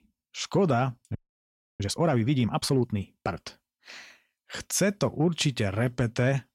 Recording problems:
audio freezing; at 1 s for 0.5 s

